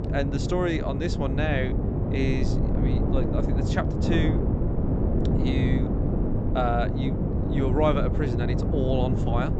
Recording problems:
high frequencies cut off; noticeable; nothing above 8 kHz
wind noise on the microphone; heavy; 3 dB below the speech
electrical hum; noticeable; throughout; 50 Hz, 20 dB below the speech

